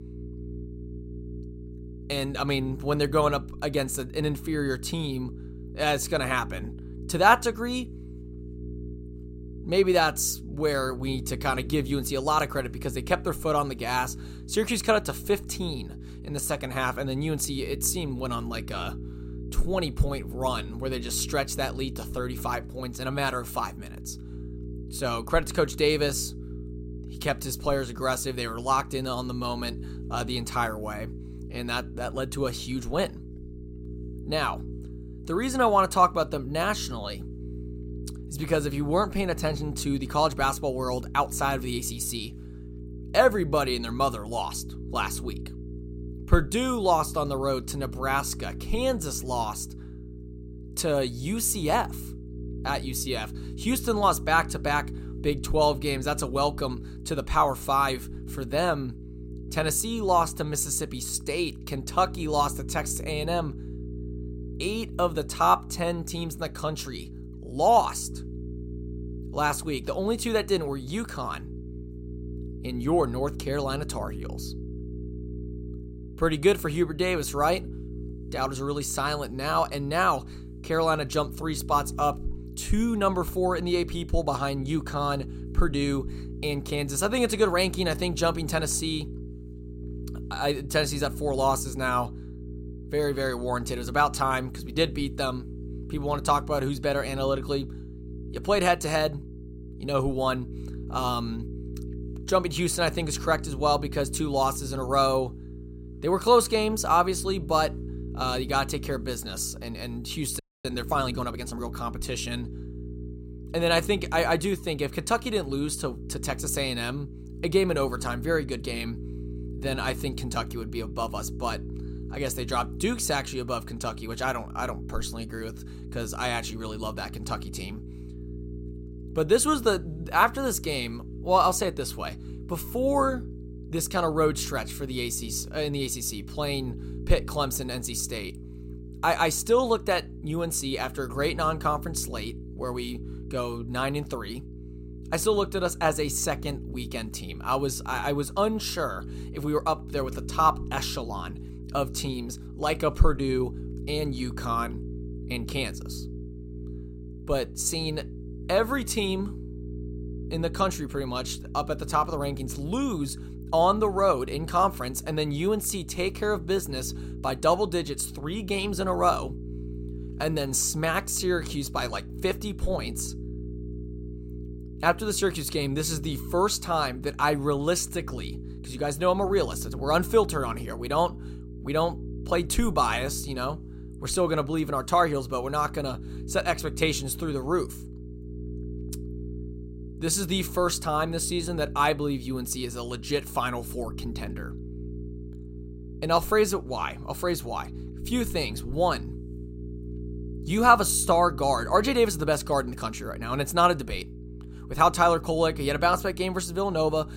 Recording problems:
electrical hum; noticeable; throughout; 60 Hz, 20 dB below the speech
audio freezing; at 1:50

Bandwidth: 16 kHz